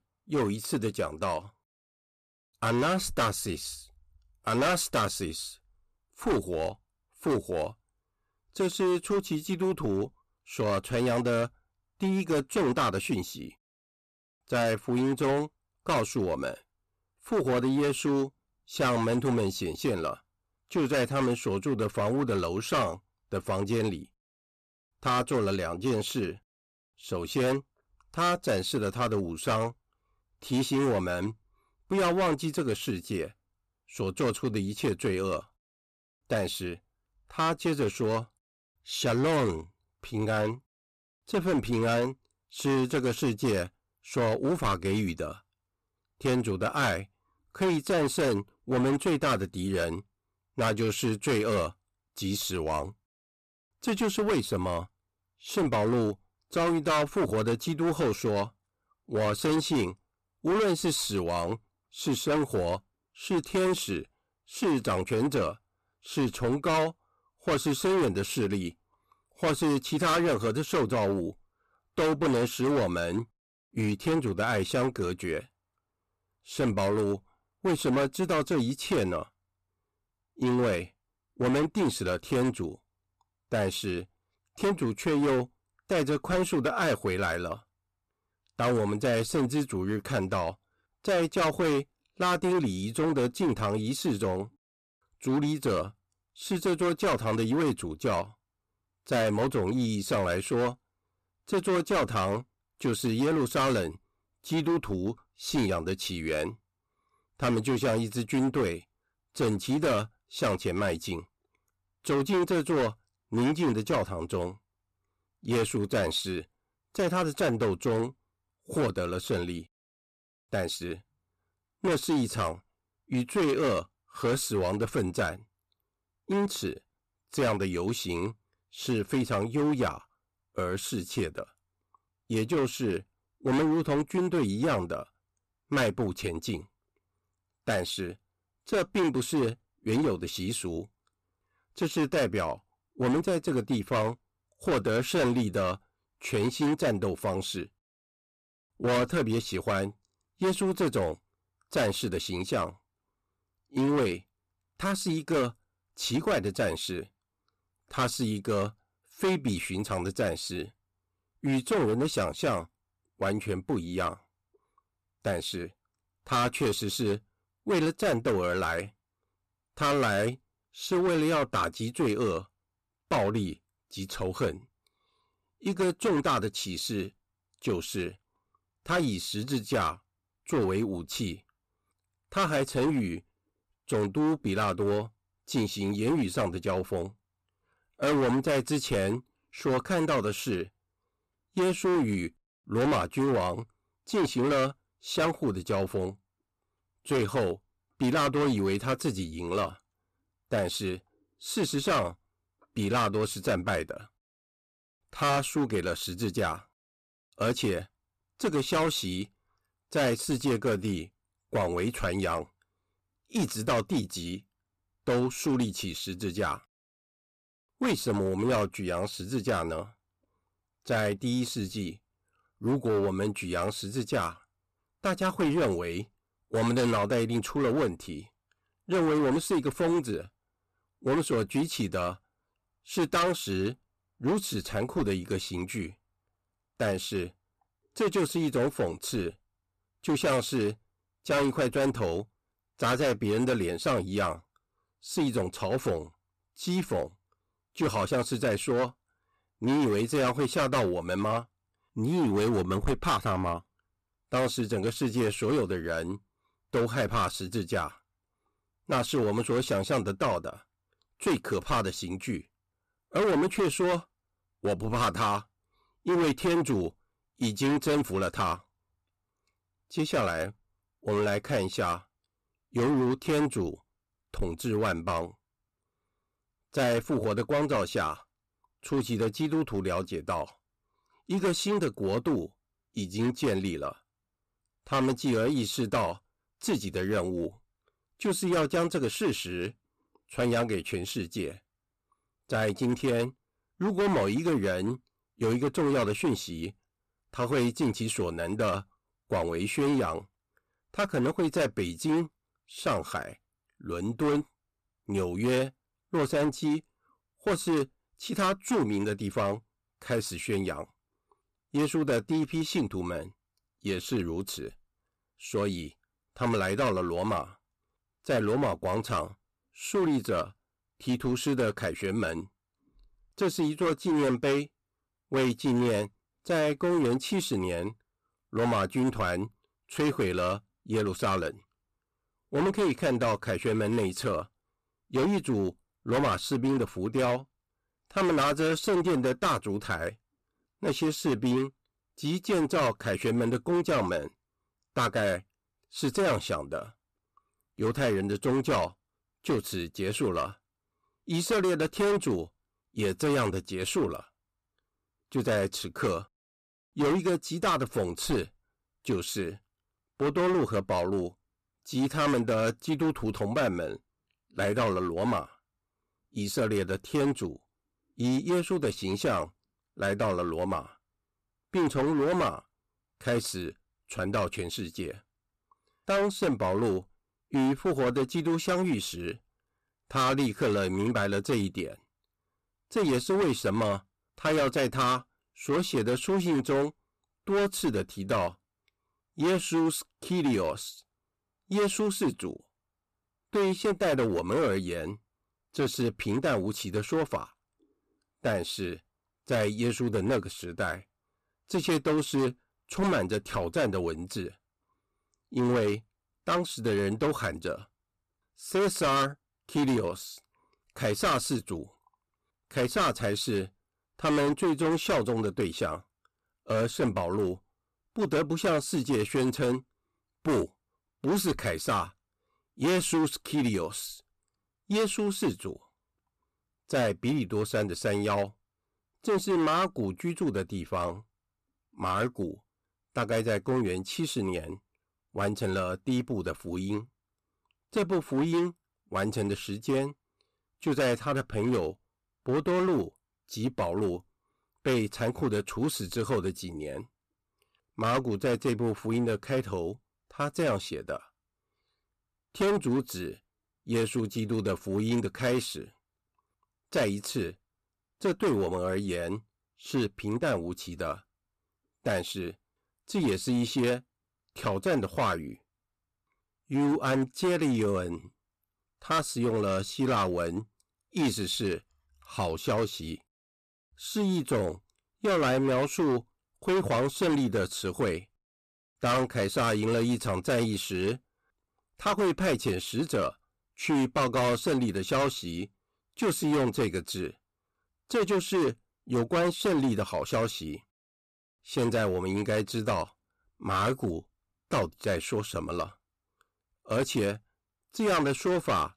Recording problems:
distortion; heavy; 10% of the sound clipped

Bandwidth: 14.5 kHz